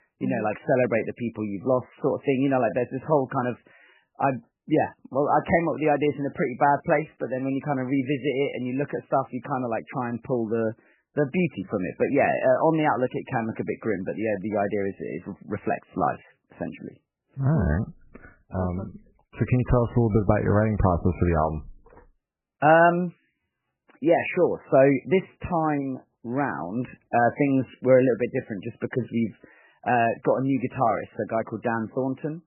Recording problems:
garbled, watery; badly; nothing above 3 kHz

